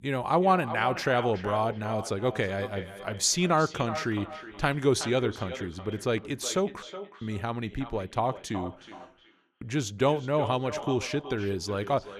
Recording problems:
echo of what is said; strong; throughout; 370 ms later, 10 dB below the speech
audio cutting out; at 7 s and at 9 s

